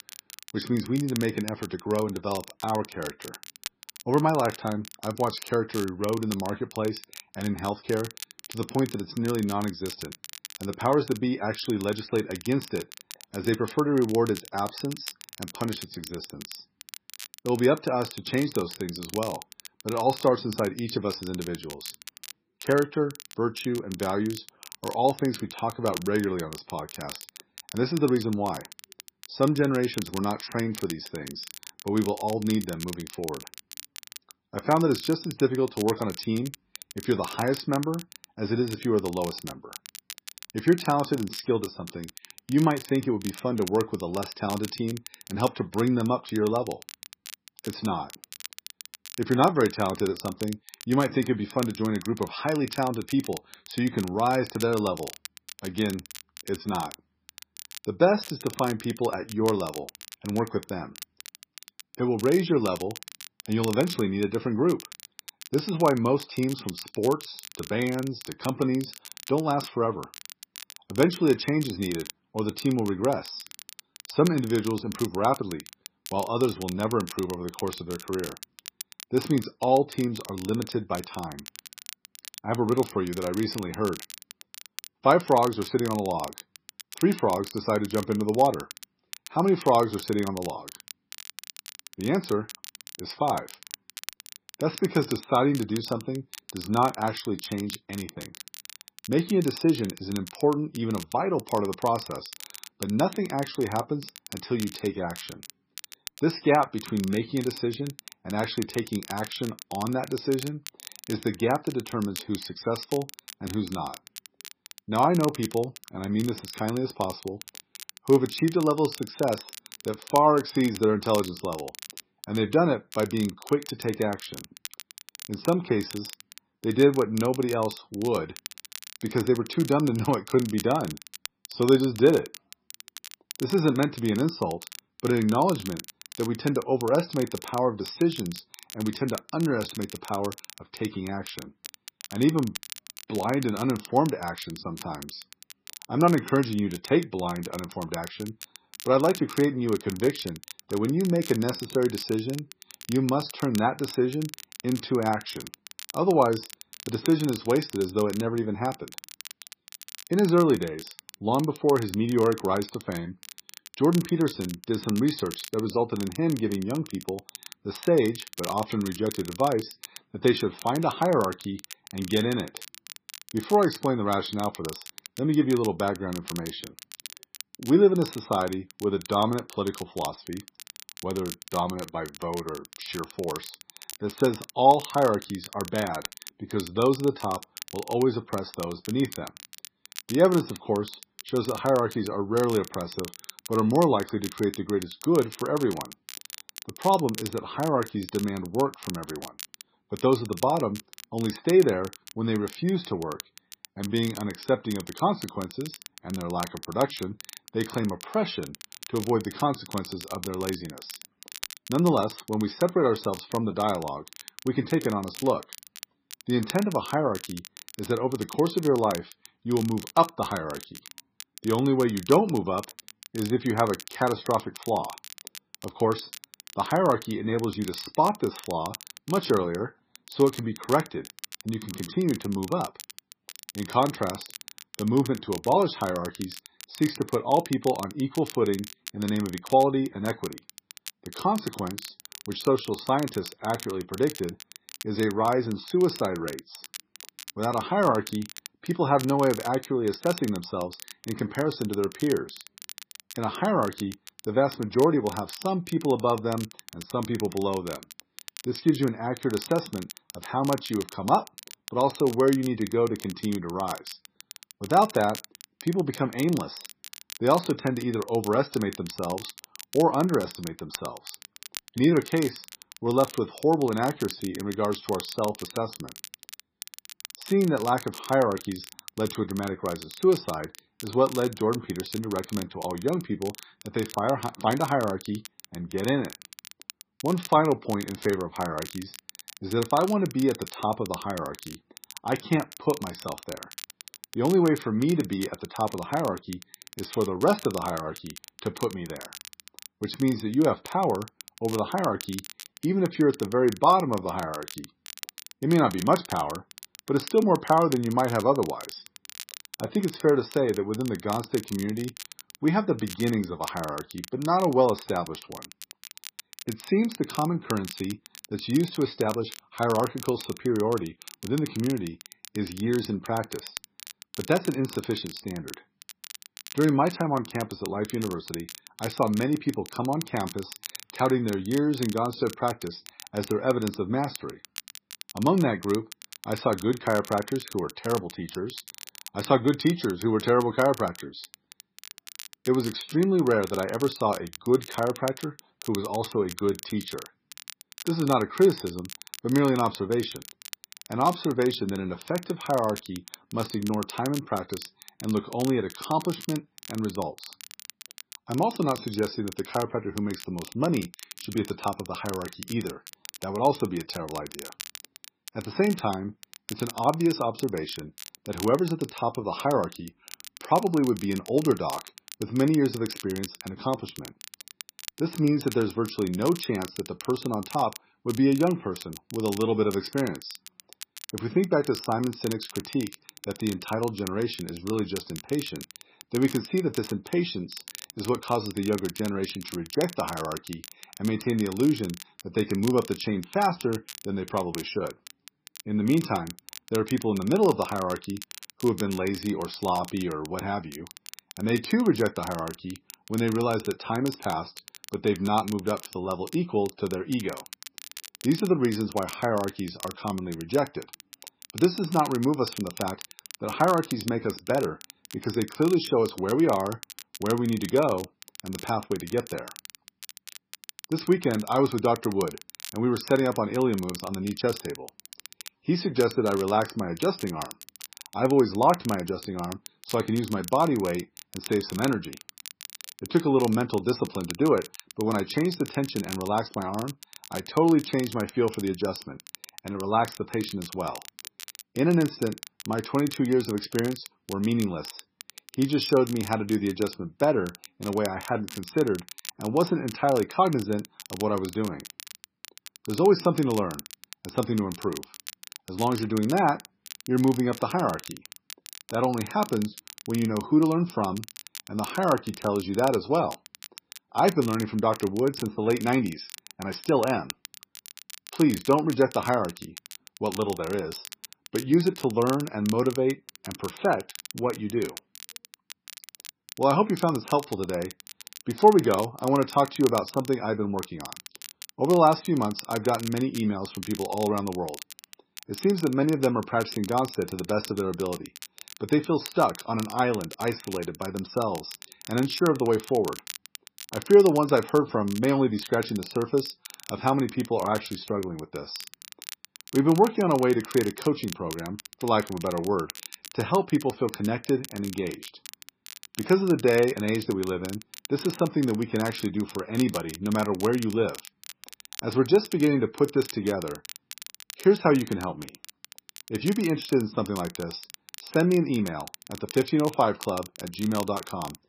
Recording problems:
garbled, watery; badly; nothing above 5.5 kHz
crackle, like an old record; noticeable; 15 dB below the speech

